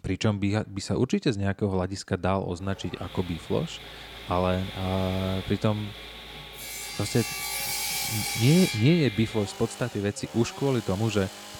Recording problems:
machinery noise; loud; from 2.5 s on; 6 dB below the speech

